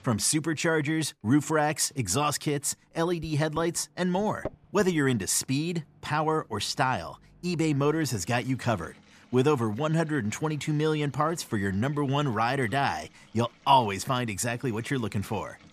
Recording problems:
household noises; faint; throughout; 25 dB below the speech

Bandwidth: 14.5 kHz